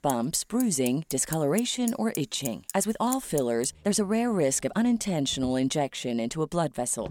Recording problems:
traffic noise; noticeable; throughout; 10 dB below the speech
uneven, jittery; strongly; from 1 to 6.5 s

